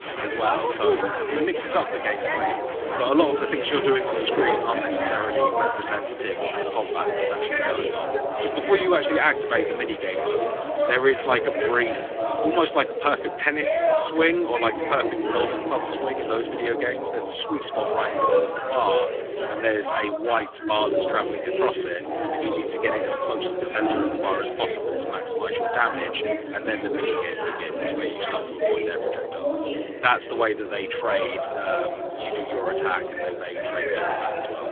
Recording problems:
phone-call audio; poor line; nothing above 3.5 kHz
chatter from many people; loud; throughout; as loud as the speech

